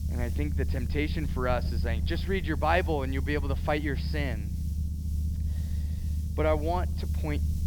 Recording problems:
high frequencies cut off; noticeable; nothing above 5.5 kHz
low rumble; noticeable; throughout; 15 dB below the speech
hiss; faint; throughout; 20 dB below the speech

